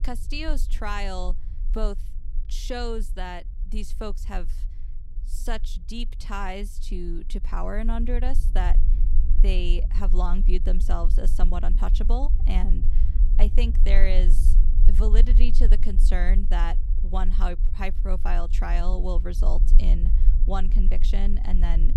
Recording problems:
low rumble; noticeable; throughout; 15 dB below the speech

